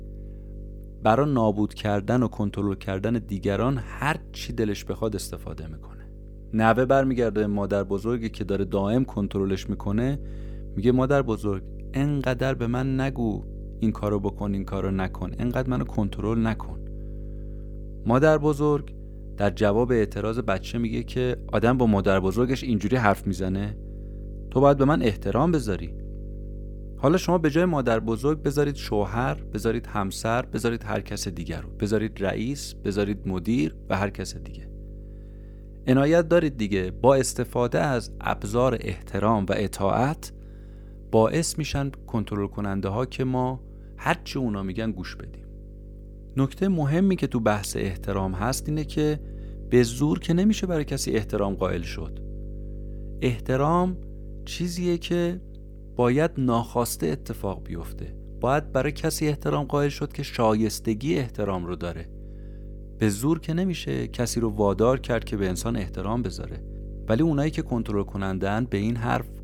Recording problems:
electrical hum; faint; throughout; 50 Hz, 25 dB below the speech

